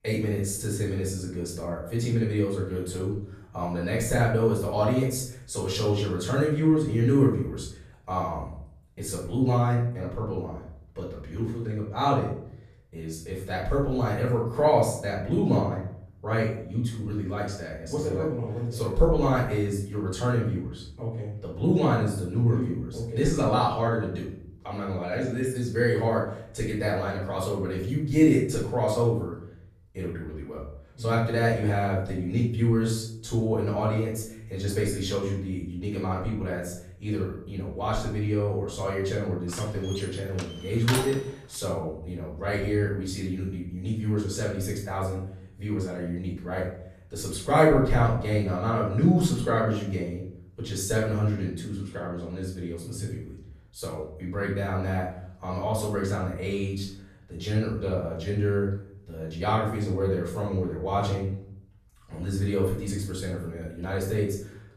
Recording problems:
off-mic speech; far
room echo; noticeable; dies away in 0.6 s
door banging; noticeable; from 40 to 41 s; peak 2 dB below the speech

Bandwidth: 14.5 kHz